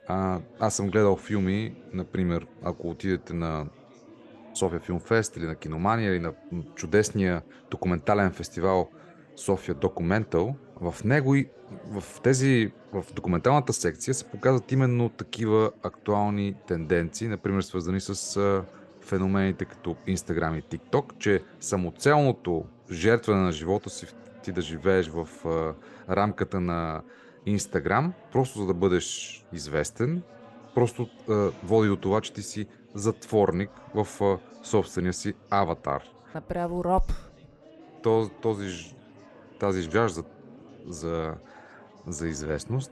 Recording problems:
chatter from many people; faint; throughout; 25 dB below the speech

